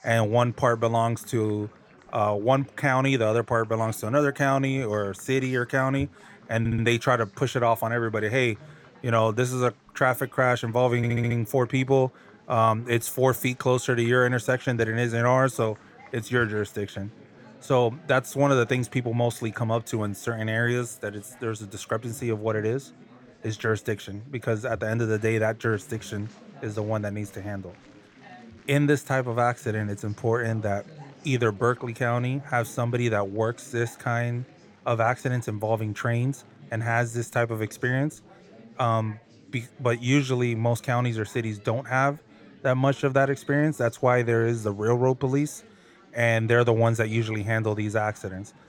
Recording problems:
chatter from many people; faint; throughout; 25 dB below the speech
audio stuttering; at 6.5 s and at 11 s

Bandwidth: 17.5 kHz